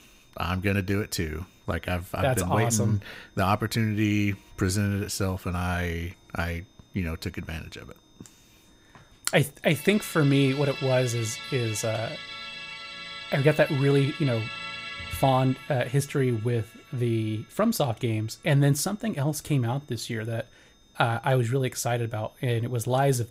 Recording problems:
background music; noticeable; throughout; 10 dB below the speech
high-pitched whine; faint; throughout; 3.5 kHz, 35 dB below the speech

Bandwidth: 15.5 kHz